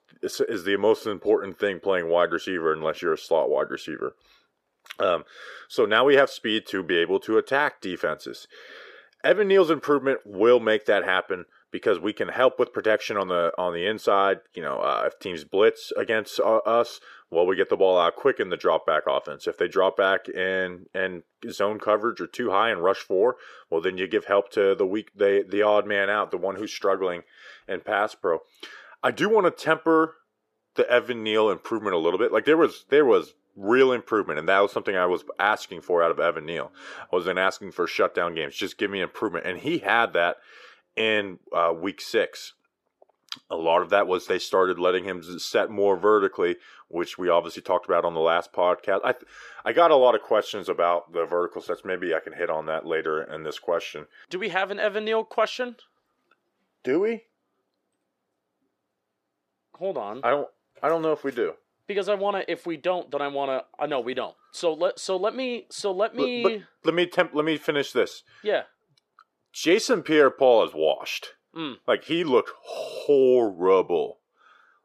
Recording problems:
muffled; slightly; fading above 2 kHz
thin; somewhat; fading below 450 Hz

